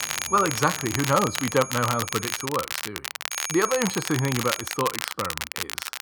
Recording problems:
muffled; slightly; fading above 2 kHz
high-pitched whine; loud; until 2.5 s and from 3.5 to 5 s; 6.5 kHz, 9 dB below the speech
crackle, like an old record; loud; 4 dB below the speech
train or aircraft noise; faint; throughout; 20 dB below the speech

